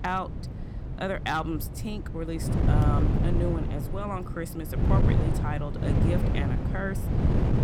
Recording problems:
wind noise on the microphone; heavy; 3 dB below the speech

